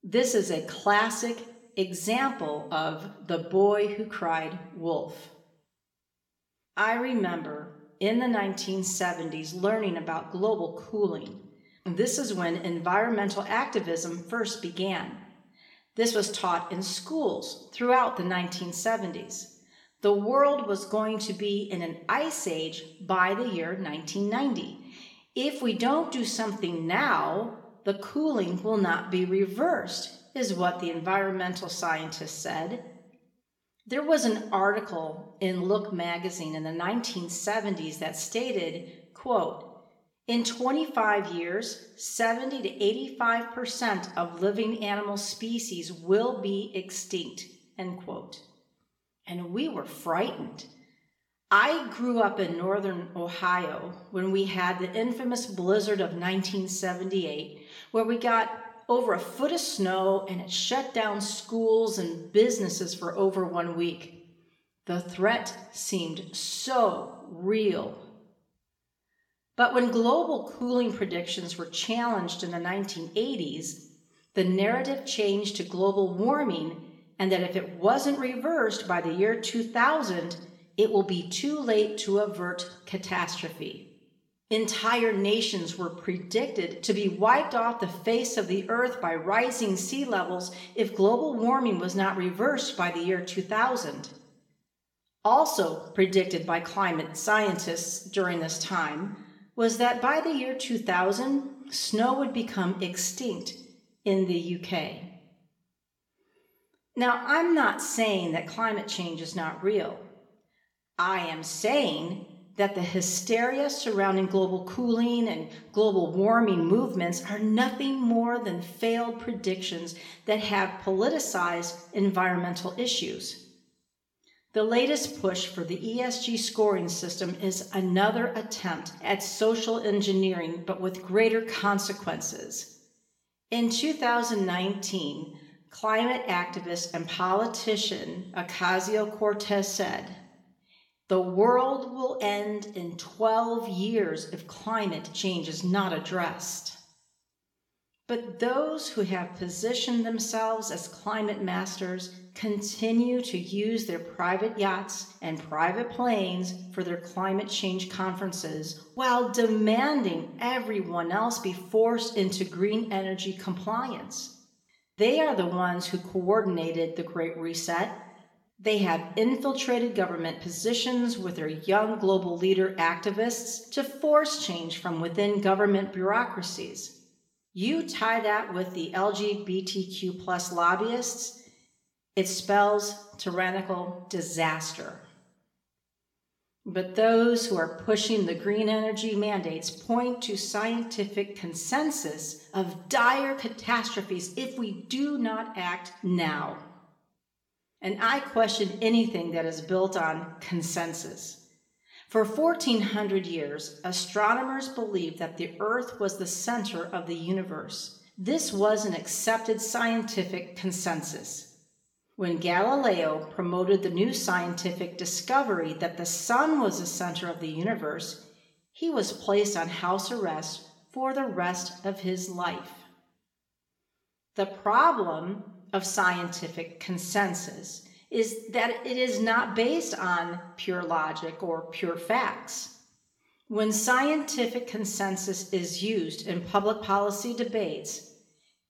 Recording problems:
room echo; slight; dies away in 0.6 s
off-mic speech; somewhat distant

